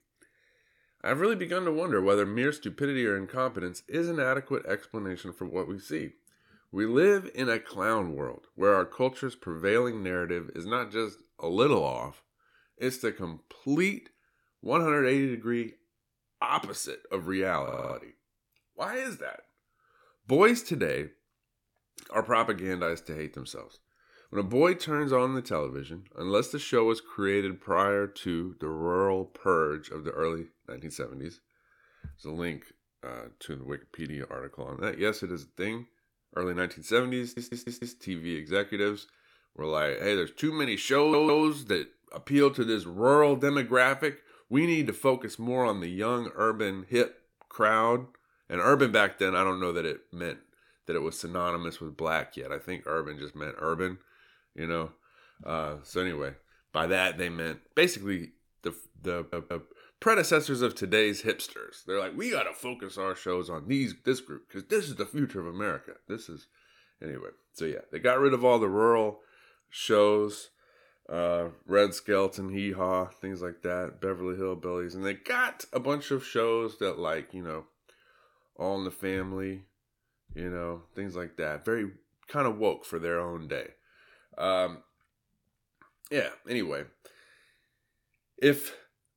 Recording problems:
audio stuttering; 4 times, first at 18 s

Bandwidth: 17.5 kHz